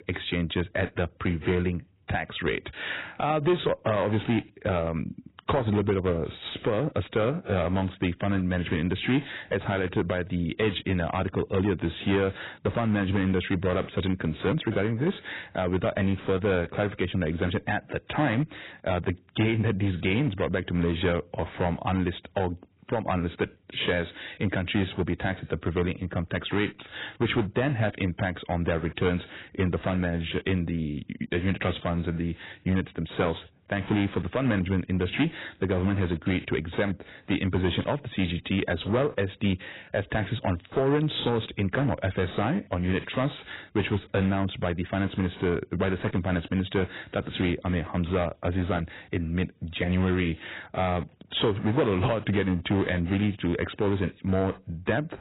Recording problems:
garbled, watery; badly; nothing above 4 kHz
distortion; slight; 4% of the sound clipped

